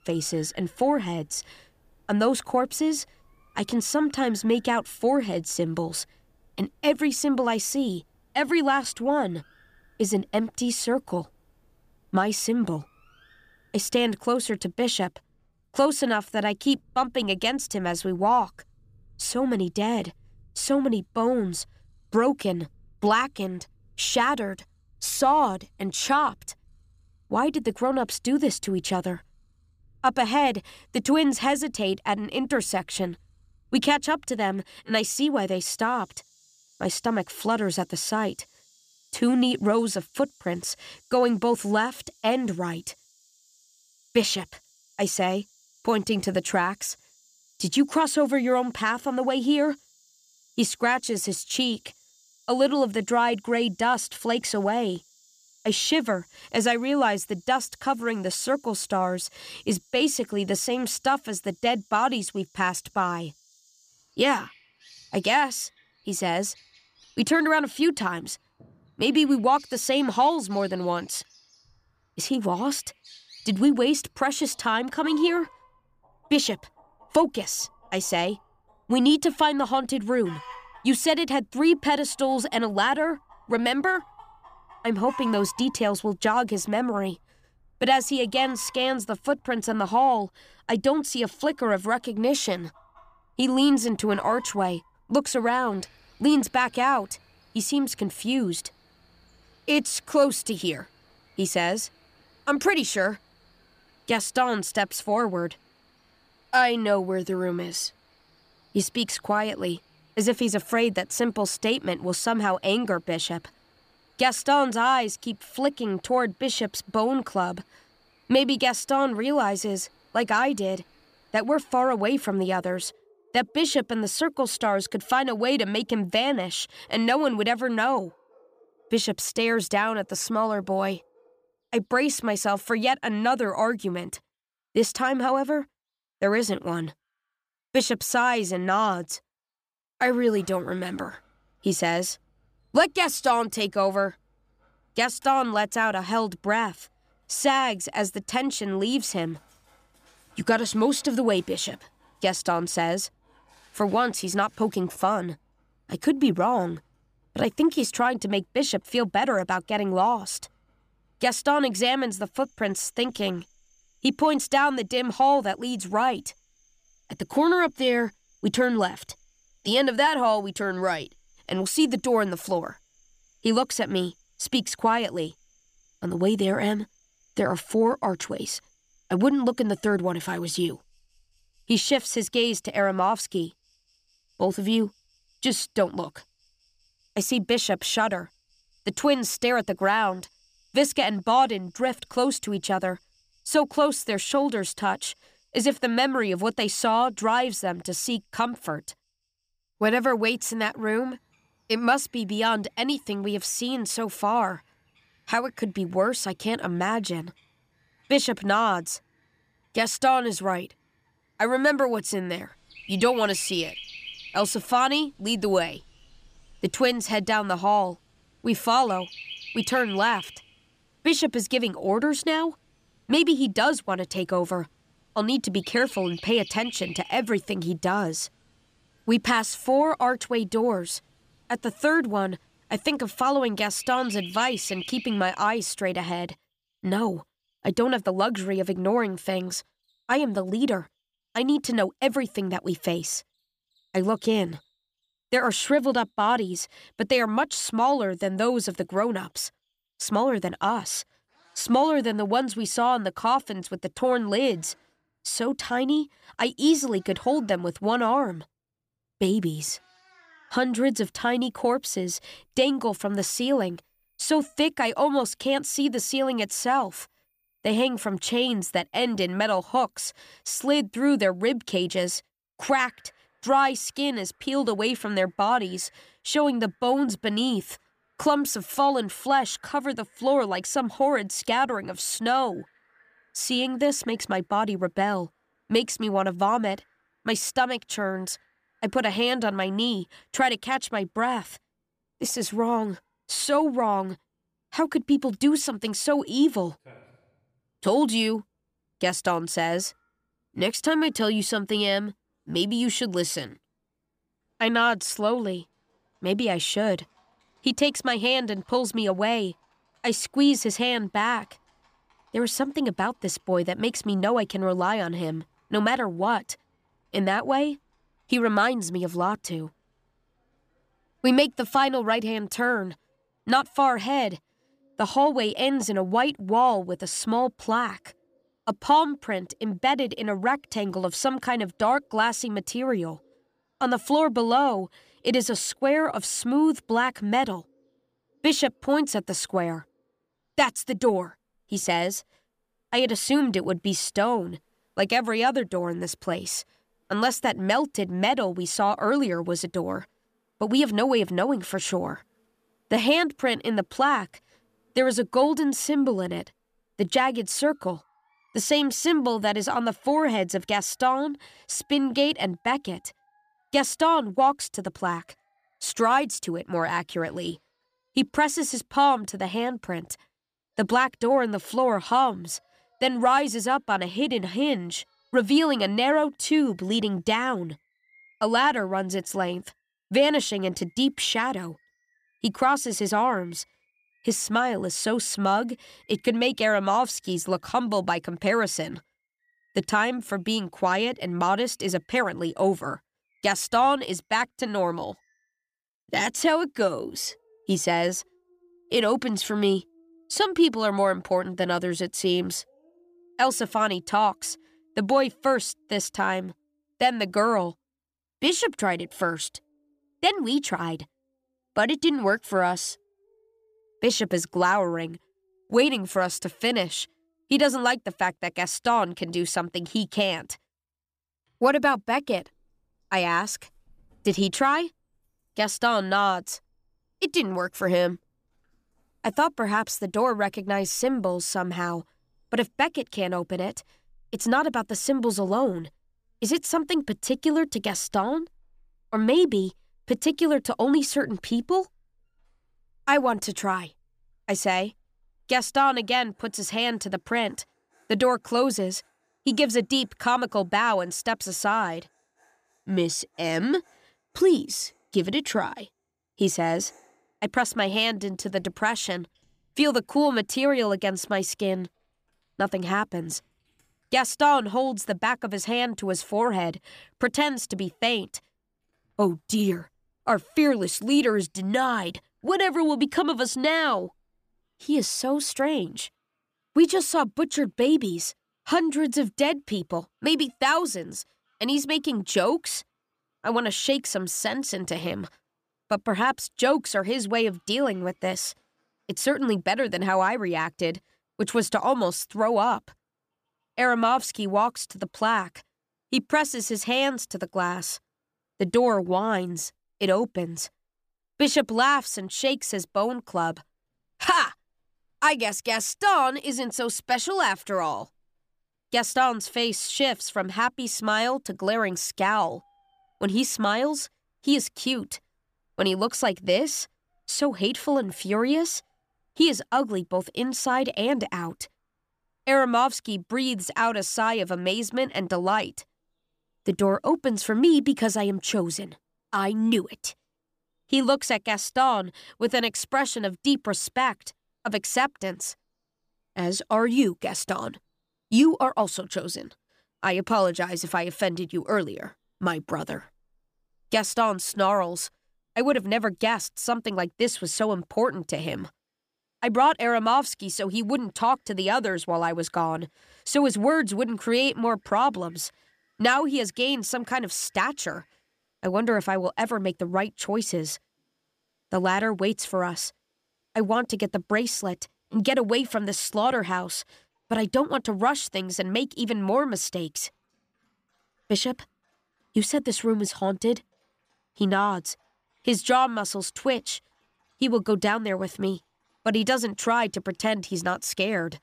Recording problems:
animal sounds; faint; throughout; 25 dB below the speech

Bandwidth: 15 kHz